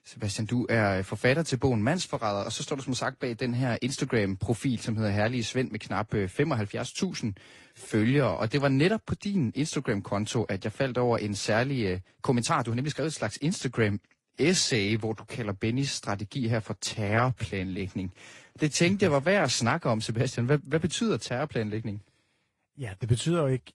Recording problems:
garbled, watery; slightly; nothing above 10.5 kHz
uneven, jittery; strongly; from 7.5 to 20 s

